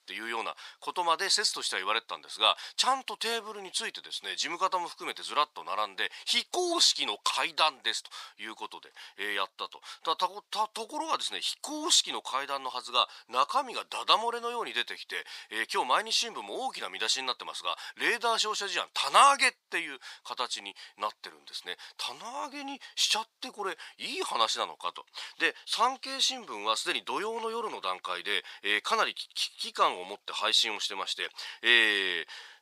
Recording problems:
thin; very; fading below 900 Hz

